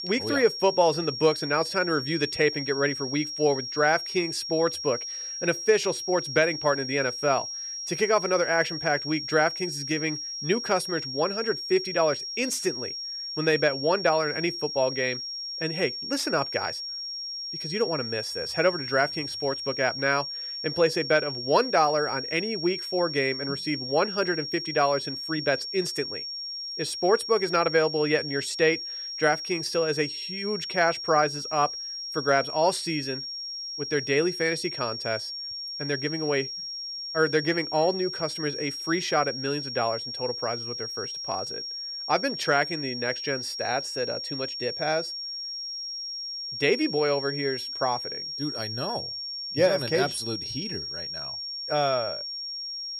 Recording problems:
high-pitched whine; loud; throughout; 5.5 kHz, 5 dB below the speech

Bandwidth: 15 kHz